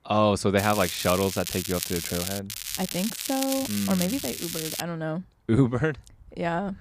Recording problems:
crackling; loud; from 0.5 to 2.5 s and from 2.5 to 5 s; 4 dB below the speech

